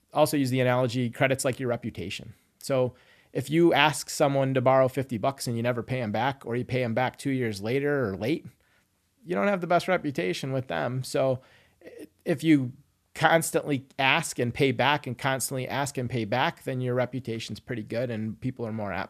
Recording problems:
none

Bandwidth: 14 kHz